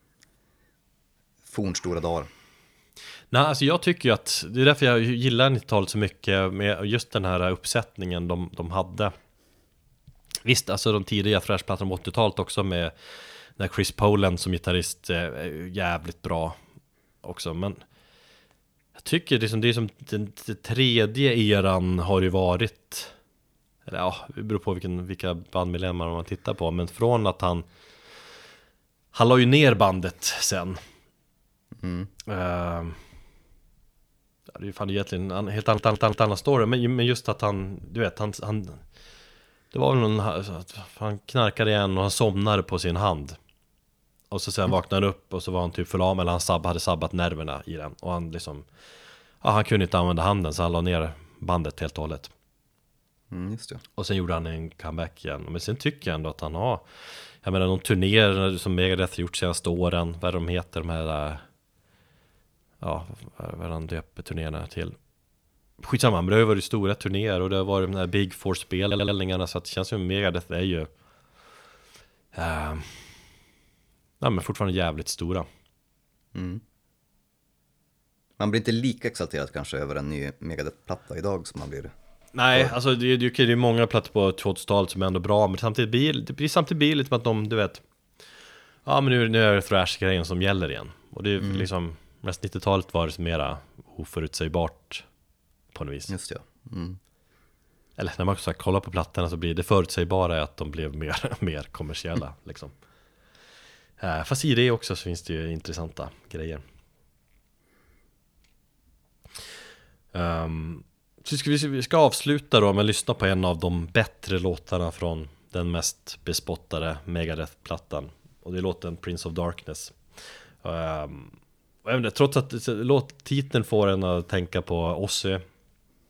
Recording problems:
audio stuttering; at 36 s and at 1:09

